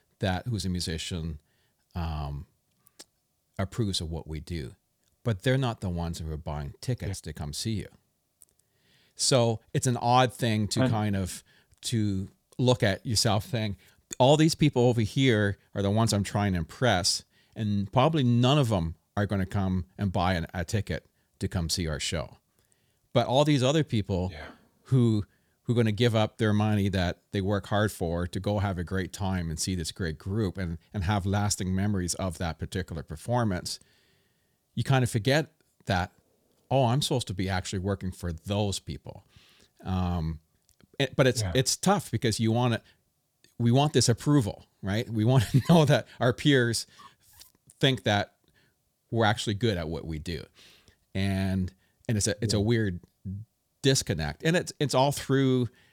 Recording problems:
none

